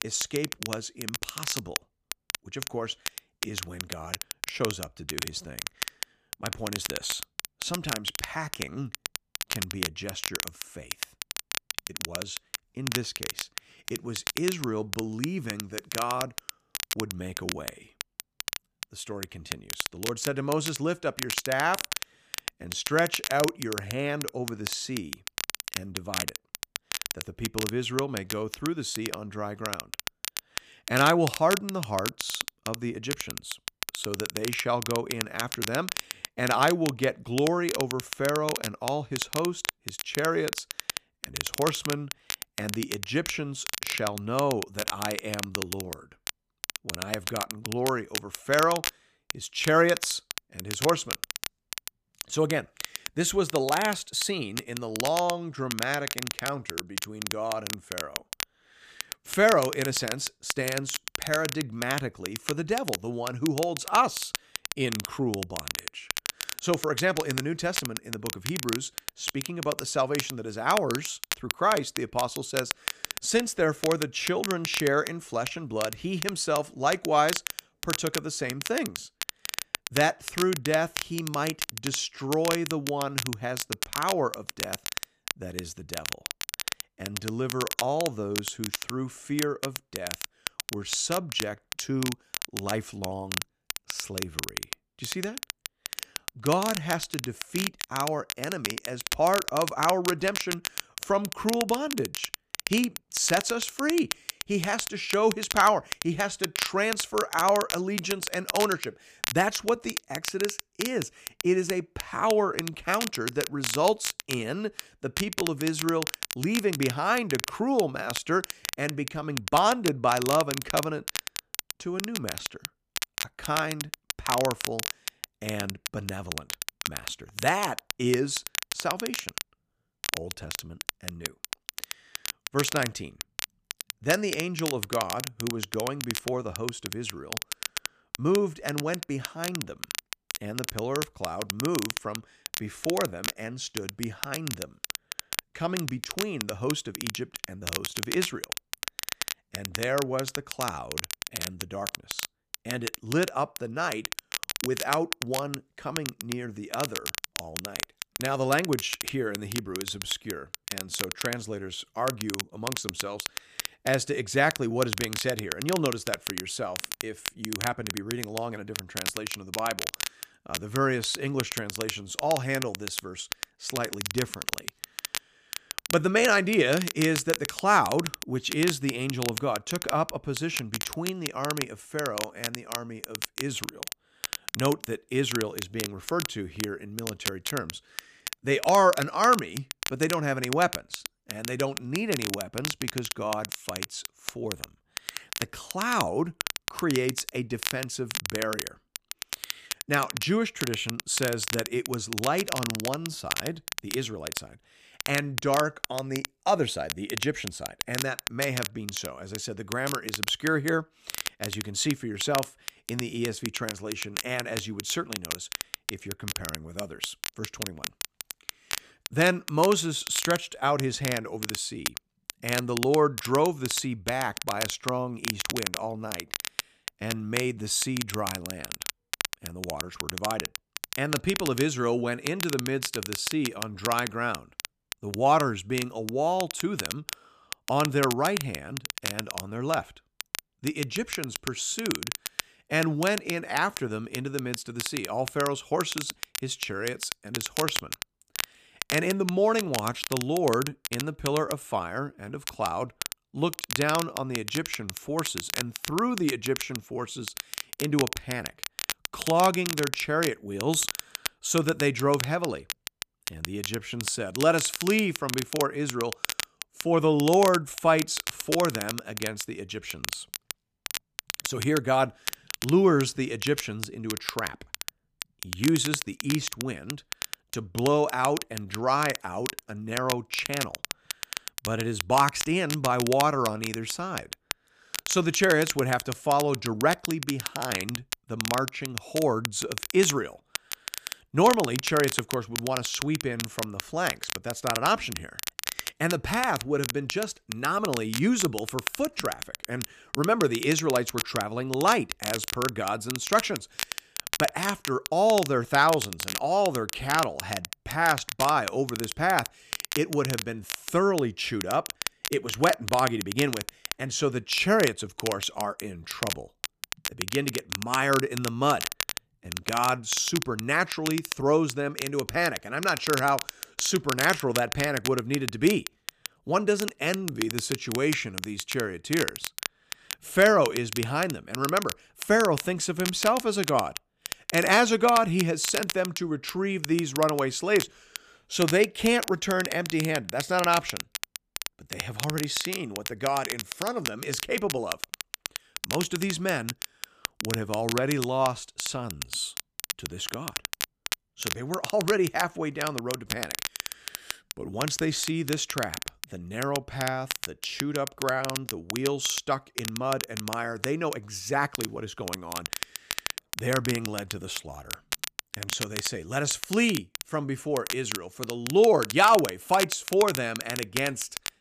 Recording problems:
crackle, like an old record; loud; 6 dB below the speech

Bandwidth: 14.5 kHz